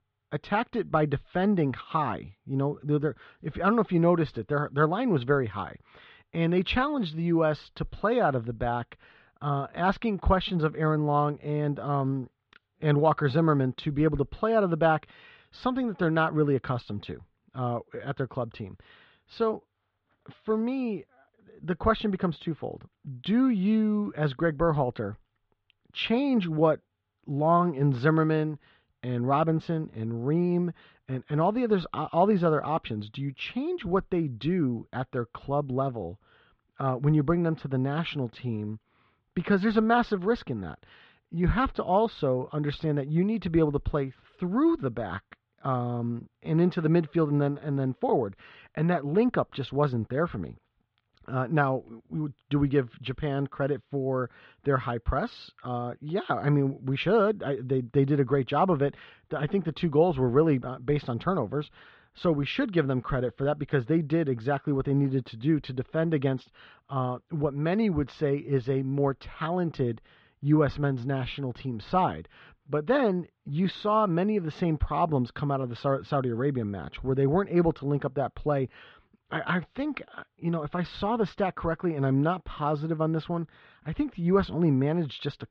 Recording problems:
muffled; very; fading above 3.5 kHz

